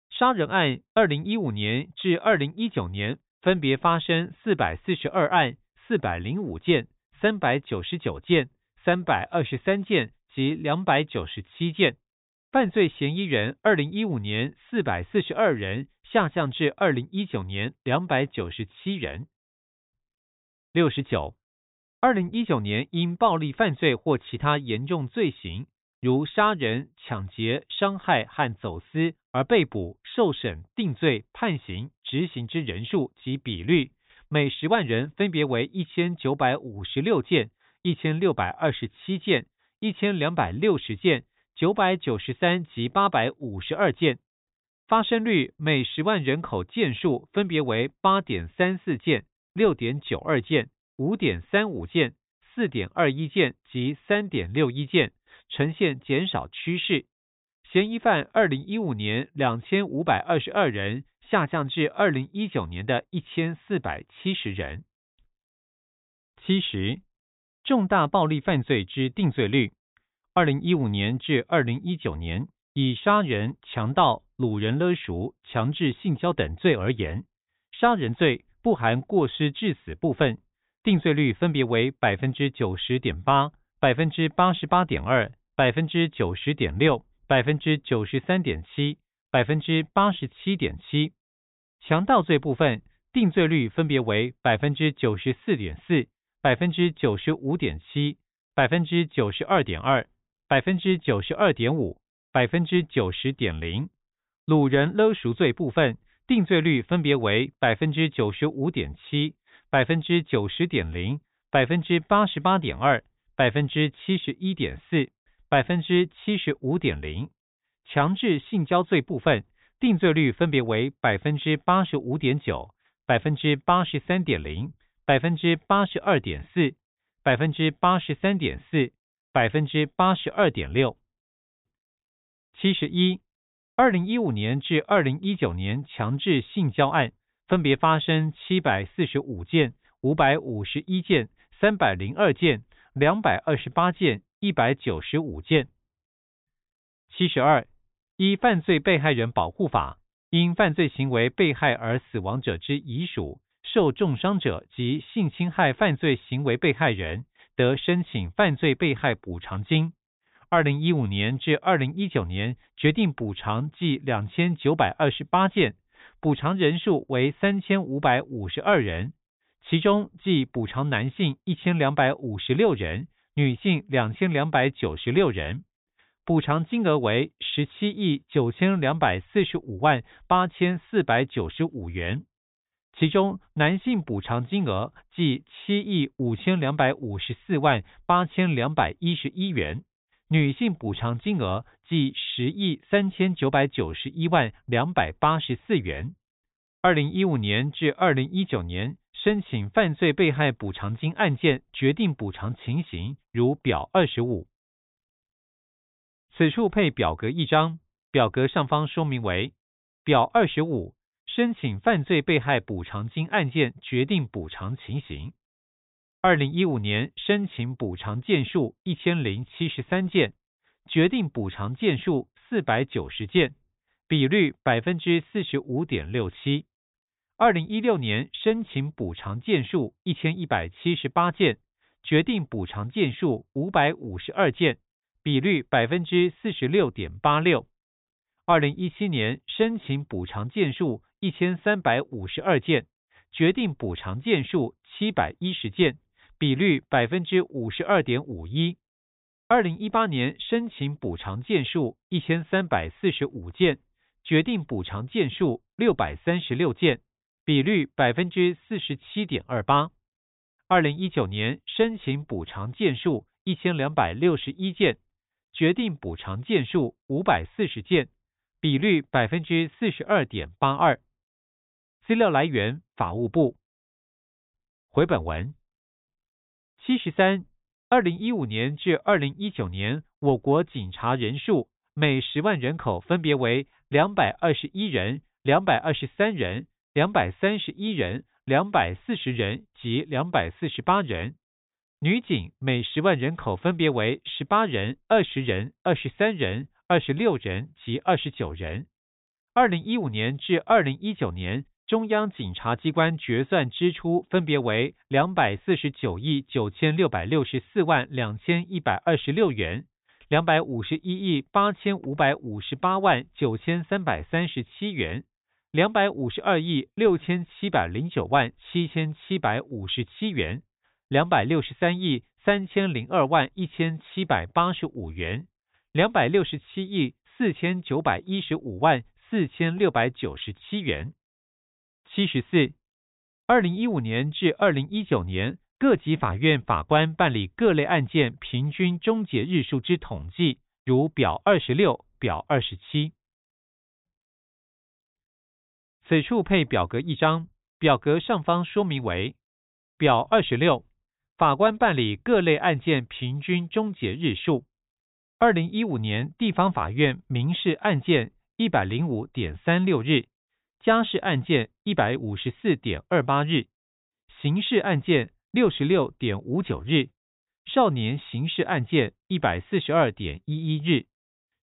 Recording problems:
high frequencies cut off; severe; nothing above 4 kHz

